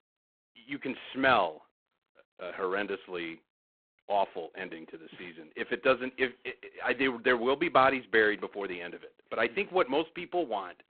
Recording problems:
phone-call audio; poor line; nothing above 3.5 kHz

